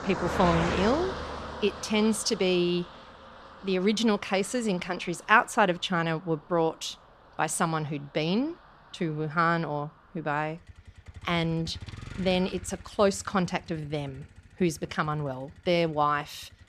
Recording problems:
traffic noise; loud; throughout; 10 dB below the speech

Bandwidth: 14.5 kHz